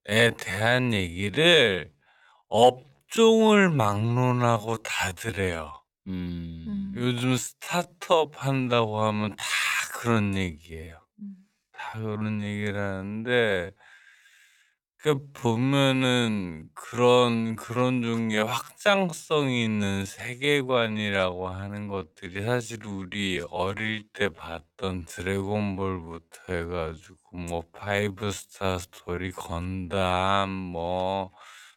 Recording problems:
wrong speed, natural pitch; too slow; 0.5 times normal speed

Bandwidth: 17.5 kHz